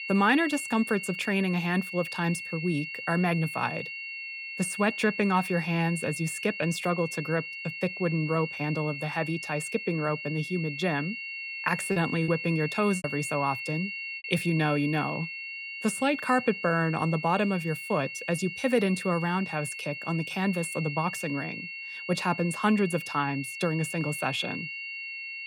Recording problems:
high-pitched whine; loud; throughout; 2.5 kHz, 7 dB below the speech
choppy; occasionally; from 12 to 13 s; 5% of the speech affected

